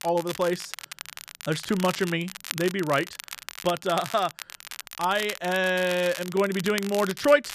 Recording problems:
crackle, like an old record; noticeable; 10 dB below the speech

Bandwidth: 14.5 kHz